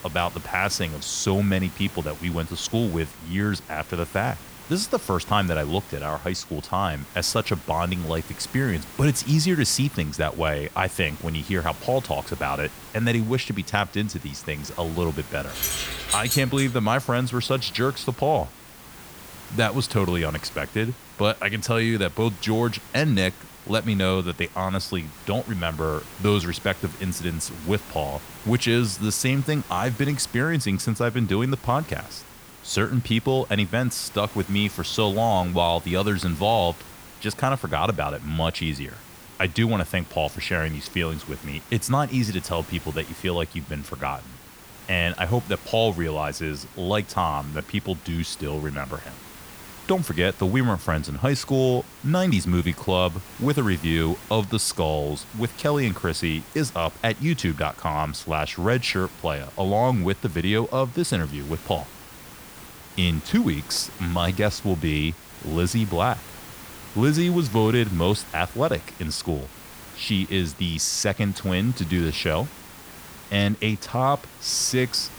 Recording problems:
hiss; noticeable; throughout; 15 dB below the speech
jangling keys; loud; from 15 to 17 s; peak 1 dB above the speech

